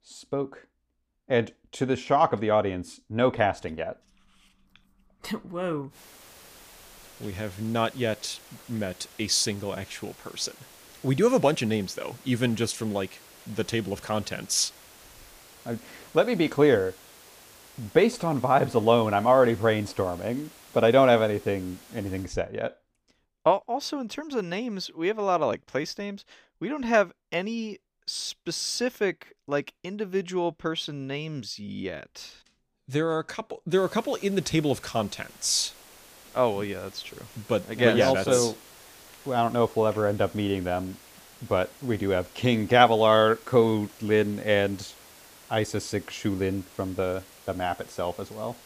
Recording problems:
hiss; faint; from 6 to 22 s and from 34 s on; 20 dB below the speech

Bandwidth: 15 kHz